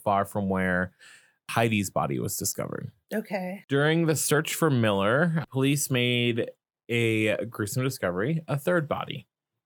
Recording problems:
none

